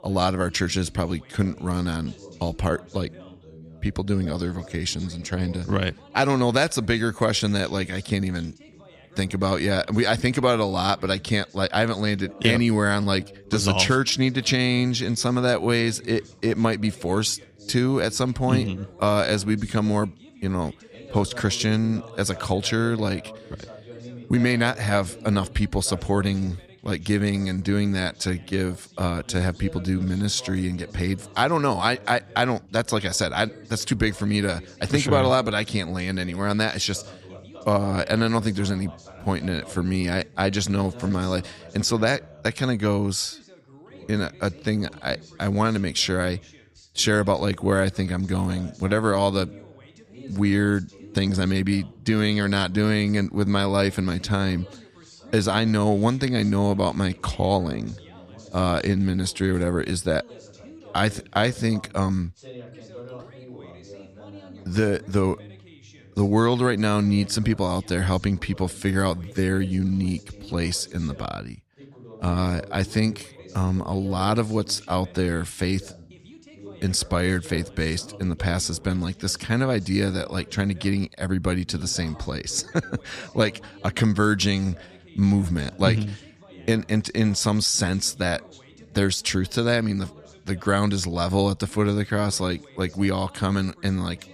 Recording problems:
background chatter; faint; throughout; 2 voices, 20 dB below the speech

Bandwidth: 14.5 kHz